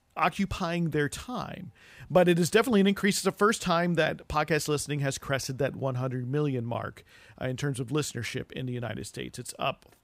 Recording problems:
none

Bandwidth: 15.5 kHz